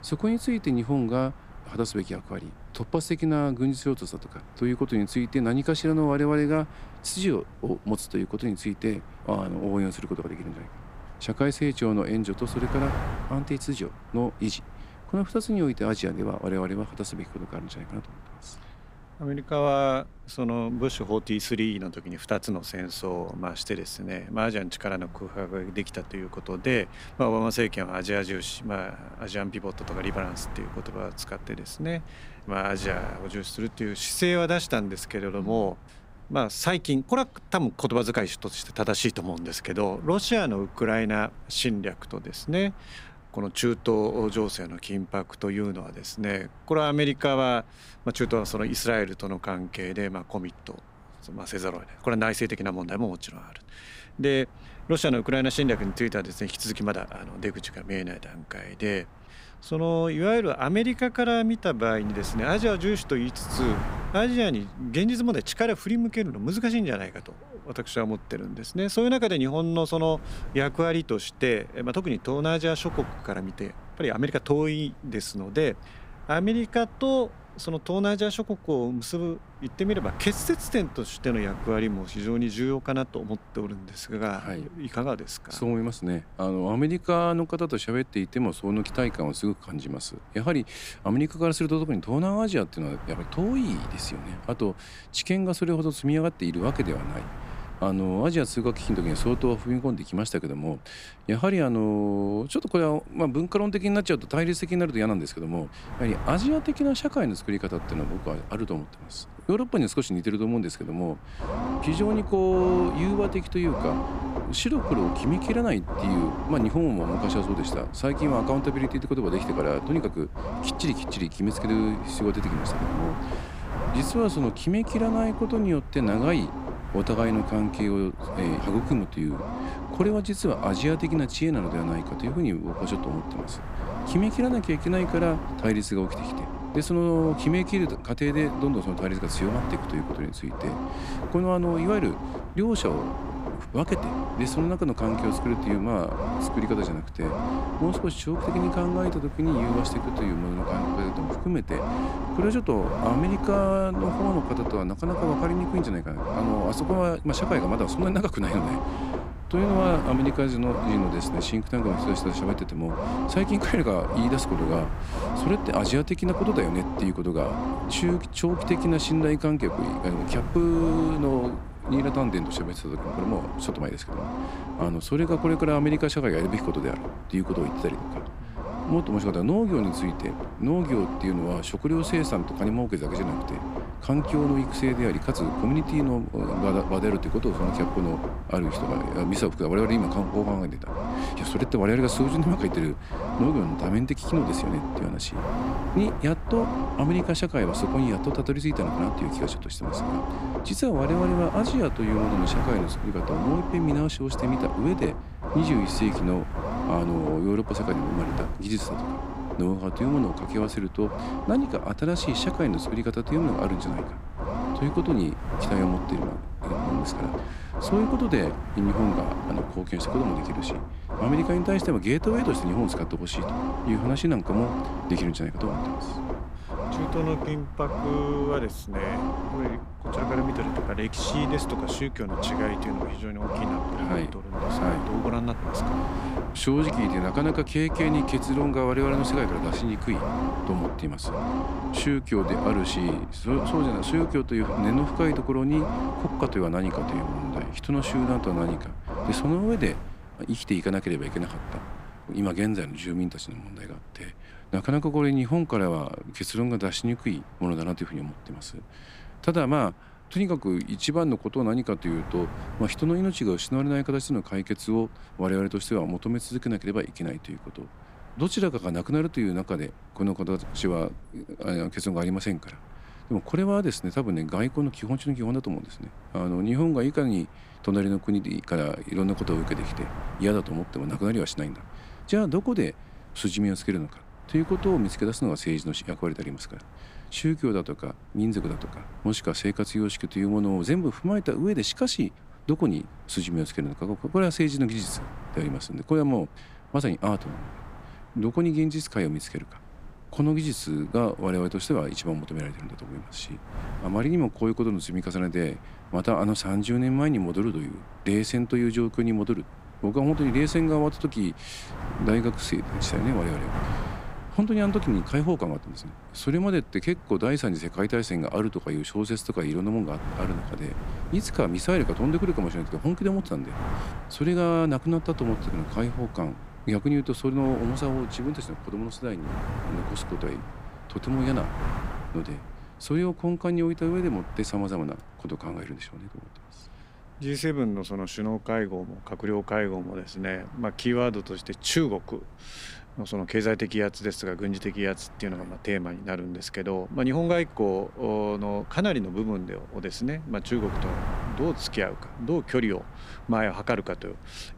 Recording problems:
low rumble; loud; from 1:51 to 4:10; 4 dB below the speech
wind noise on the microphone; occasional gusts; 15 dB below the speech

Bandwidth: 15.5 kHz